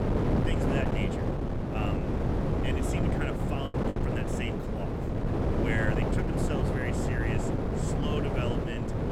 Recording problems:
wind noise on the microphone; heavy; 4 dB above the speech
choppy; very; at 3.5 s; 9% of the speech affected

